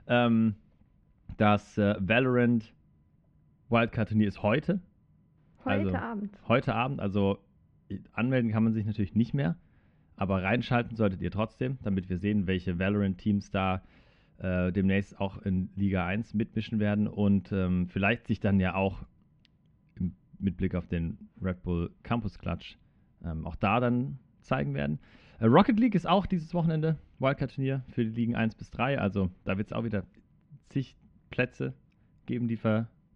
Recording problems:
muffled; very; fading above 2 kHz

